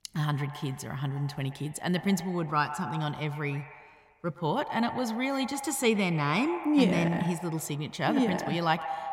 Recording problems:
echo of what is said; strong; throughout; 120 ms later, 10 dB below the speech

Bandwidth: 16 kHz